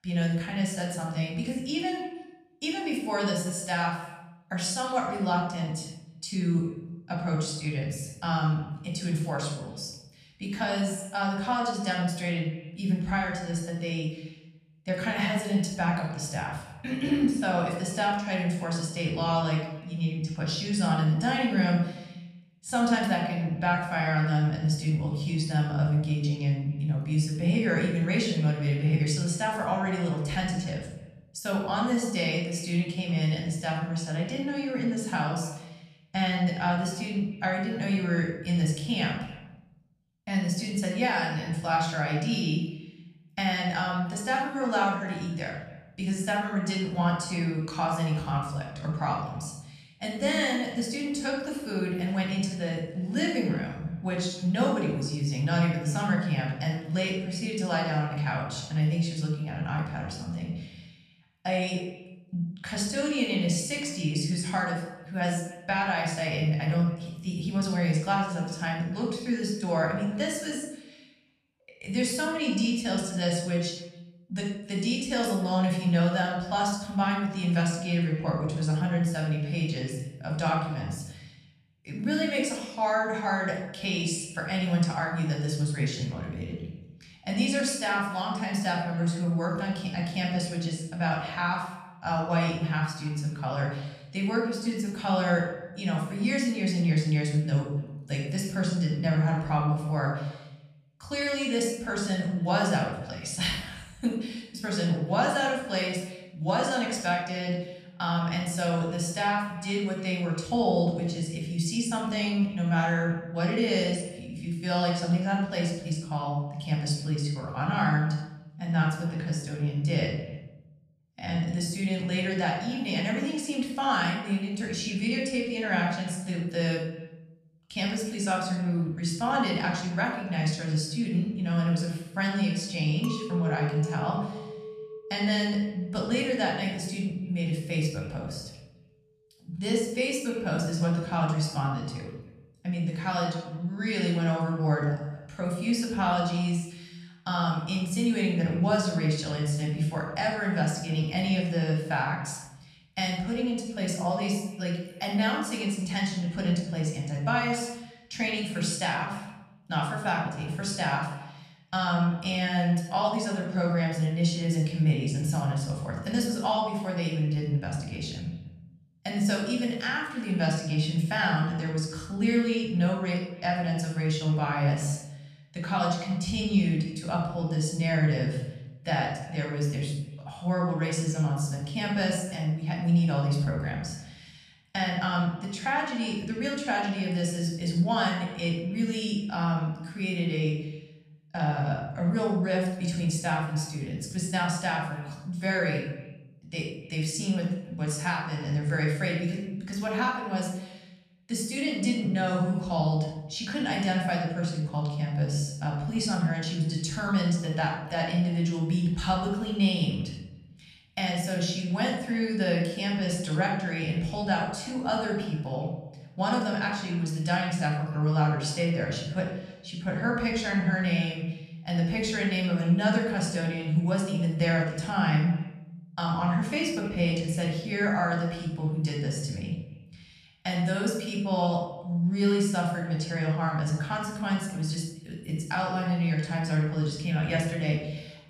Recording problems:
off-mic speech; far
room echo; noticeable; dies away in 0.8 s
echo of what is said; faint; throughout; 280 ms later, 25 dB below the speech
clattering dishes; noticeable; from 2:13 to 2:17; peak 8 dB below the speech

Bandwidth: 14 kHz